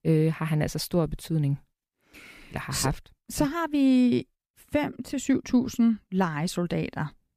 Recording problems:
none

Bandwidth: 15 kHz